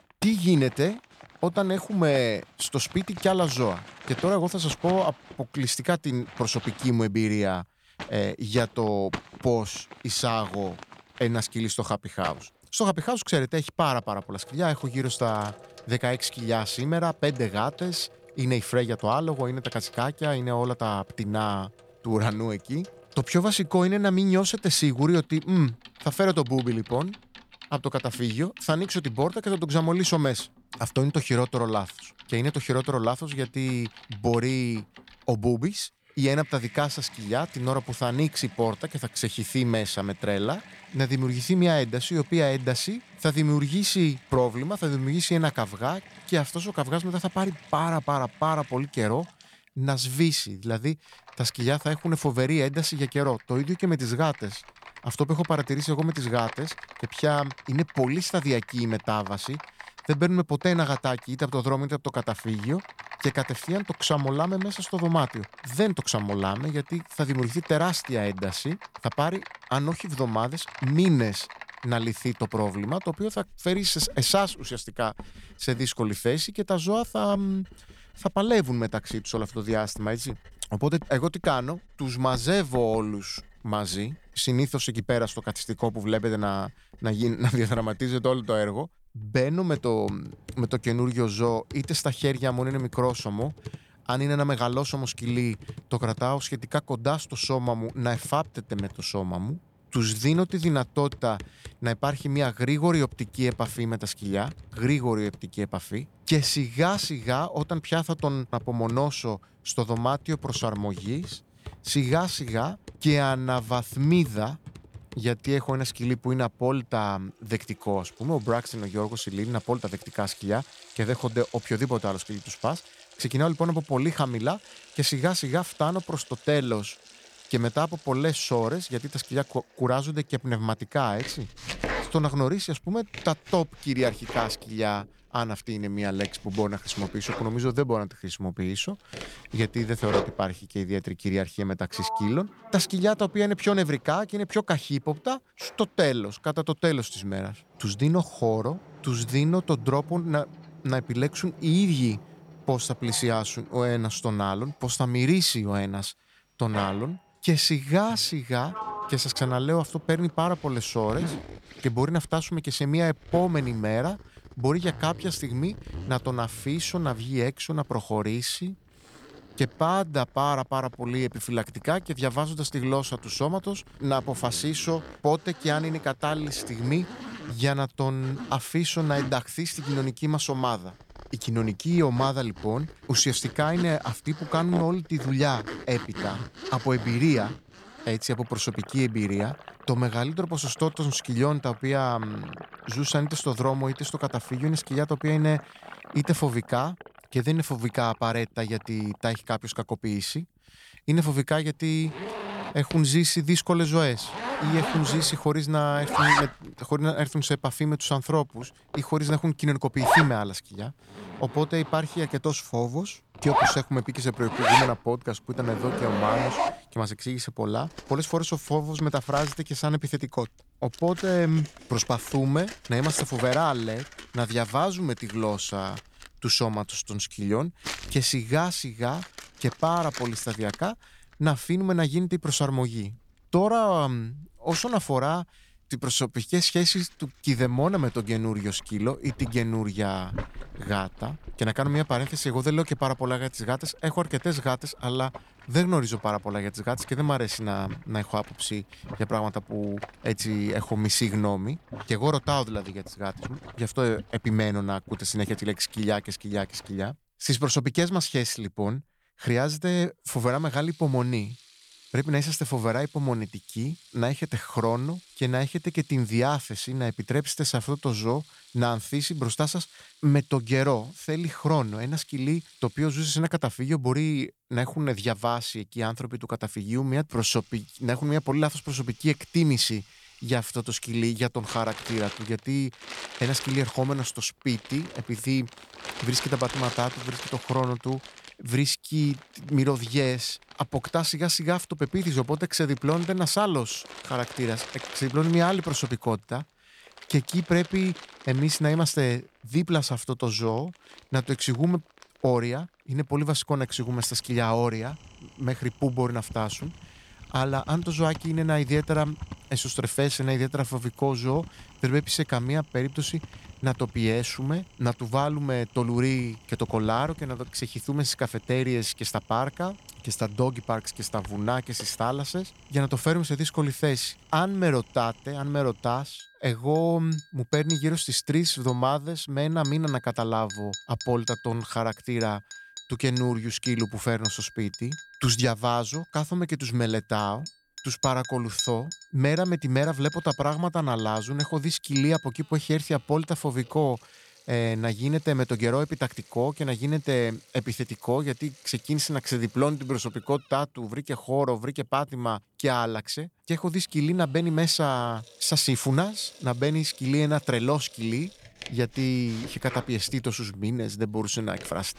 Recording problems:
household noises; noticeable; throughout; 10 dB below the speech

